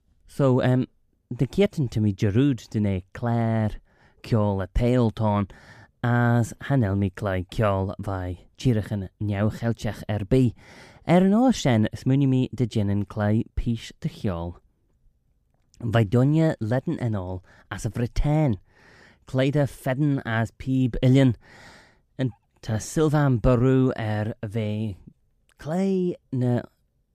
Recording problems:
none

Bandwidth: 15 kHz